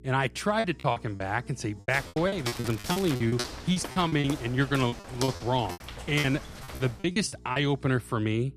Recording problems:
crackling; noticeable; at 2.5 s; 15 dB below the speech
electrical hum; faint; throughout; 60 Hz, 25 dB below the speech
choppy; very; 15% of the speech affected
footsteps; noticeable; from 2 to 7 s; peak 6 dB below the speech

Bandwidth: 14.5 kHz